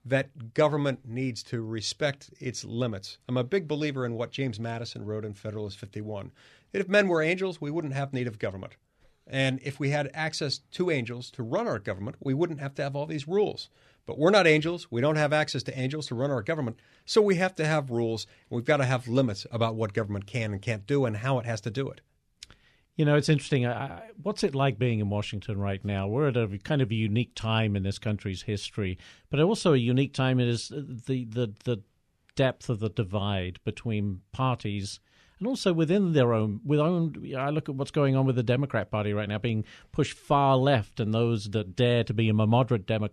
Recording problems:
none

